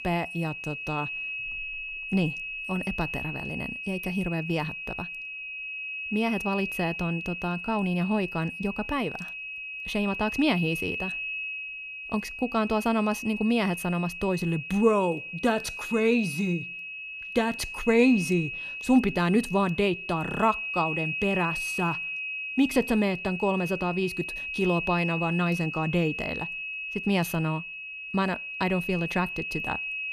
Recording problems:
high-pitched whine; loud; throughout; 2.5 kHz, 5 dB below the speech

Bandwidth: 14.5 kHz